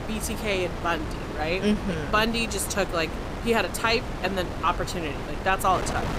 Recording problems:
wind noise on the microphone; heavy; 9 dB below the speech

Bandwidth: 15.5 kHz